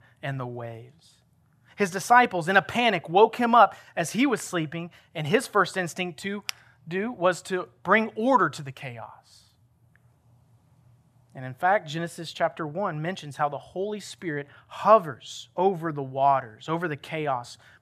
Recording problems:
none

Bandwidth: 14.5 kHz